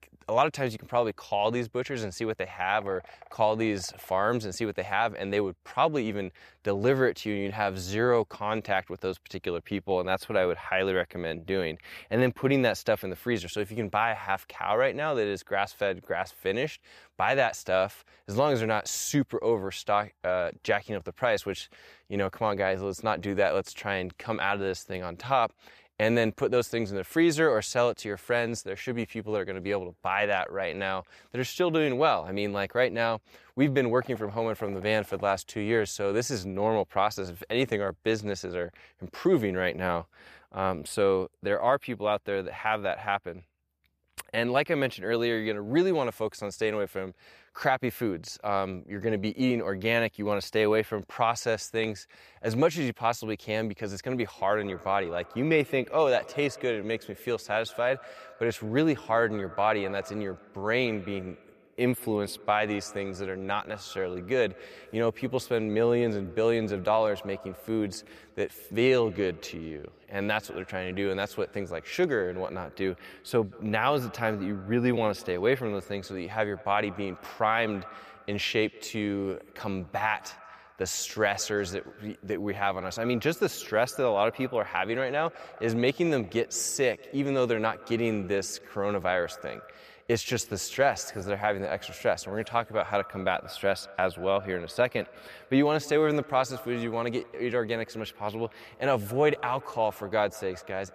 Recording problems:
echo of what is said; faint; from 54 s on; 180 ms later, 20 dB below the speech

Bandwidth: 14.5 kHz